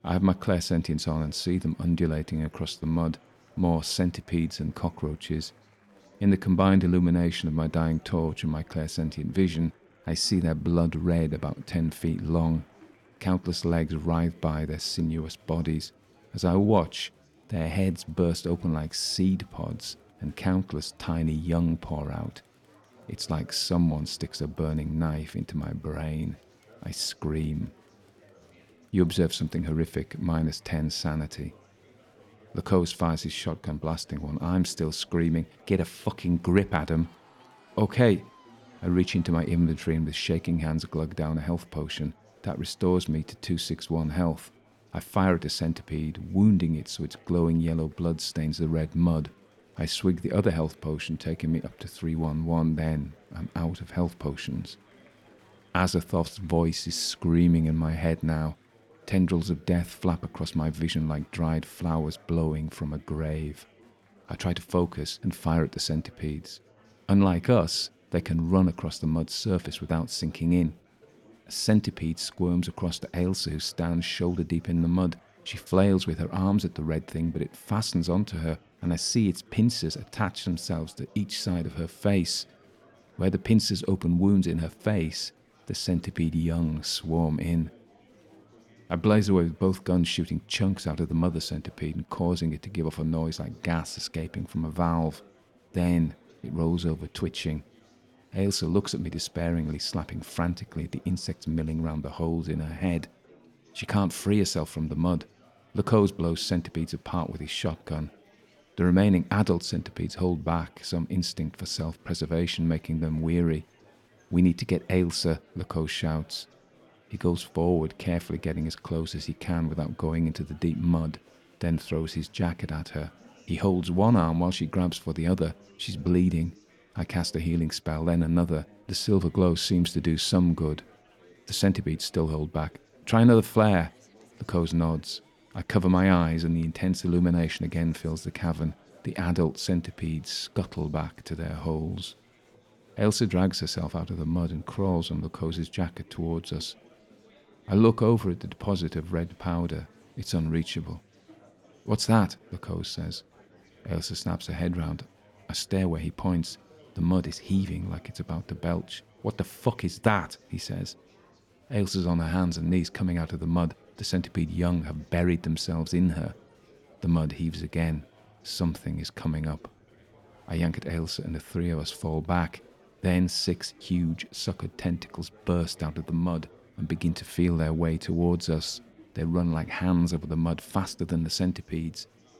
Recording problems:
murmuring crowd; faint; throughout; 30 dB below the speech

